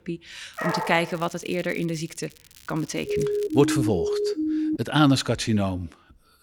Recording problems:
crackling; faint; from 0.5 to 3.5 s; 25 dB below the speech
dog barking; noticeable; at 0.5 s; peak 3 dB below the speech
siren; noticeable; from 3 to 5 s; peak level with the speech

